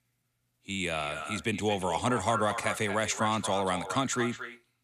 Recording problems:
echo of what is said; strong; throughout; 230 ms later, 8 dB below the speech

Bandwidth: 14.5 kHz